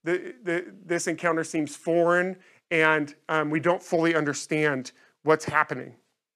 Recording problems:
none

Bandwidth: 14.5 kHz